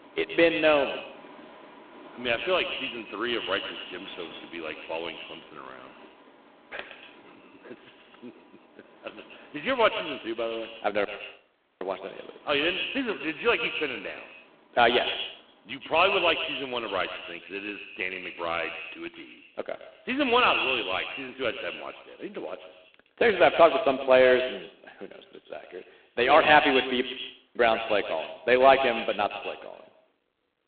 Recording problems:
phone-call audio; poor line
echo of what is said; strong; throughout; 120 ms later, 7 dB below the speech
traffic noise; faint; throughout; 25 dB below the speech
audio cutting out; at 11 s for 1 s and at 27 s for 0.5 s

